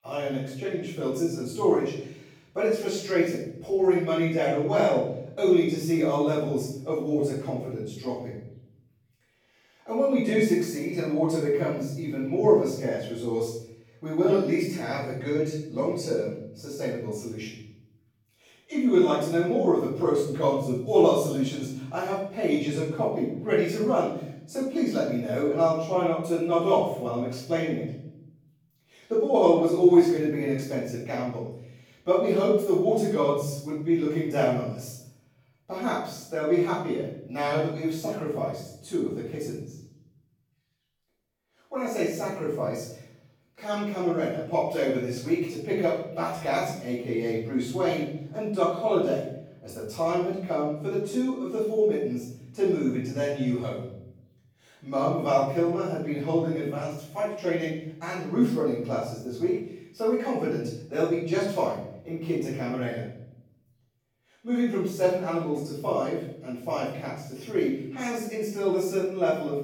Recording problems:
off-mic speech; far
room echo; noticeable; dies away in 0.8 s

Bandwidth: 18.5 kHz